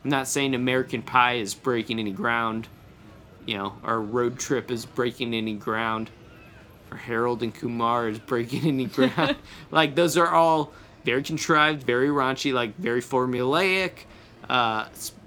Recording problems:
traffic noise; faint; throughout; 30 dB below the speech
murmuring crowd; faint; throughout; 25 dB below the speech
uneven, jittery; strongly; from 1 to 15 s

